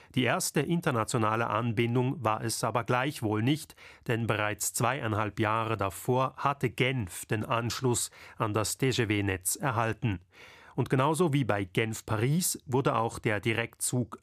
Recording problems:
none

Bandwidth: 14.5 kHz